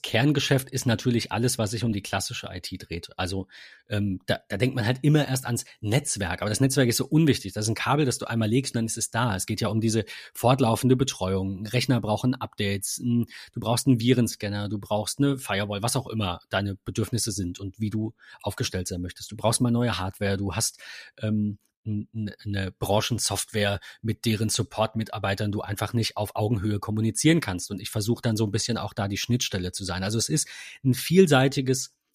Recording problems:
none

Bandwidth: 14.5 kHz